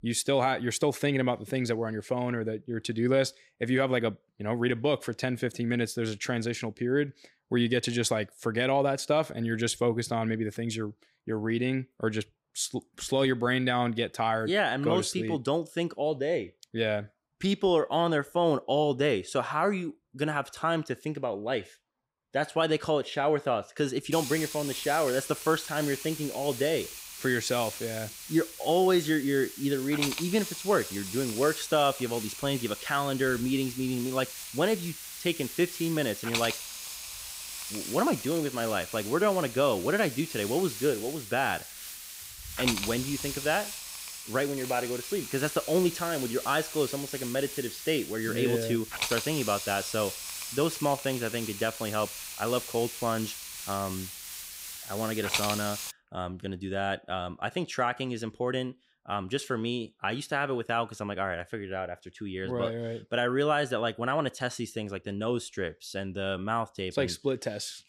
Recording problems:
hiss; loud; from 24 to 56 s; 7 dB below the speech

